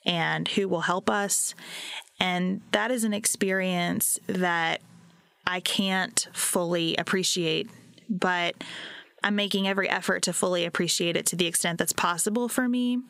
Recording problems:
squashed, flat; heavily

